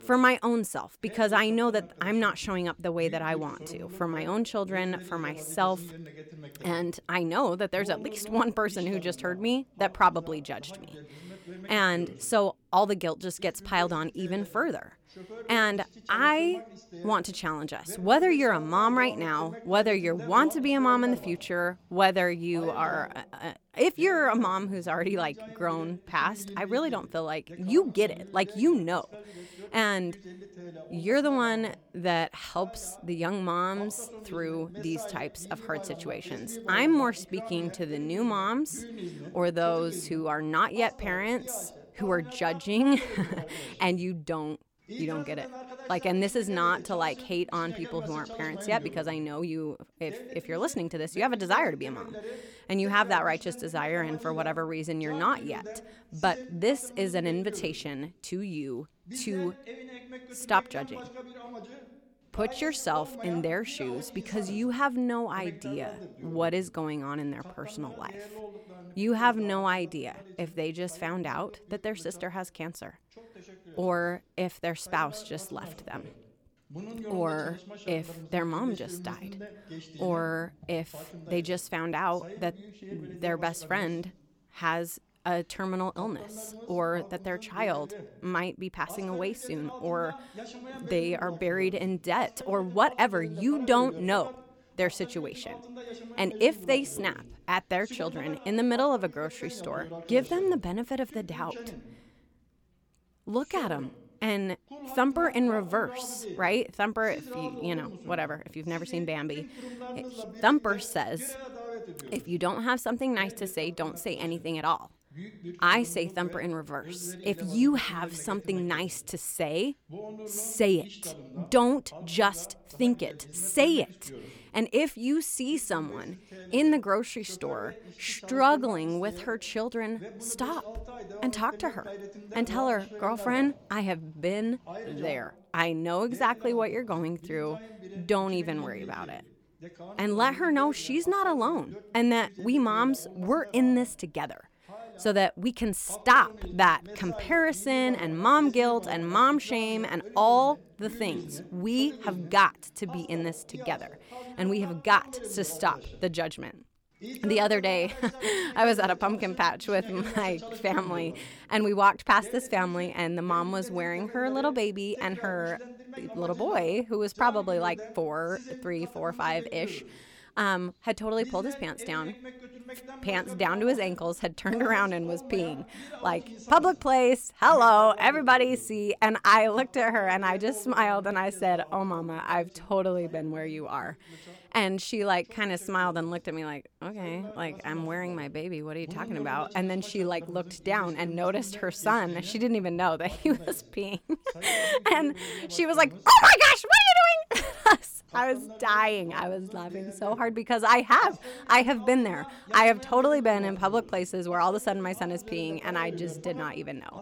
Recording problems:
voice in the background; noticeable; throughout; 15 dB below the speech

